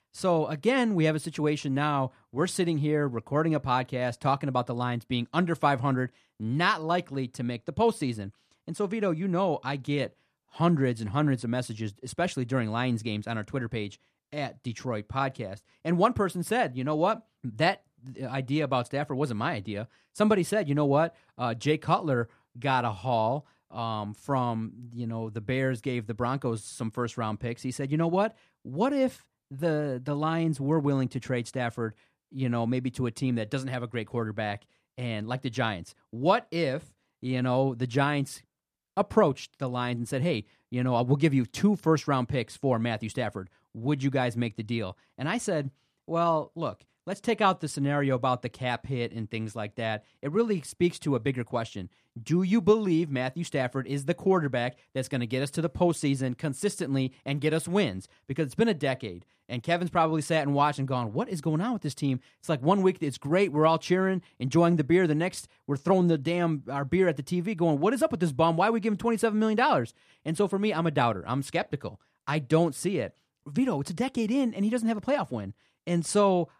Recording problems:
none

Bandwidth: 14.5 kHz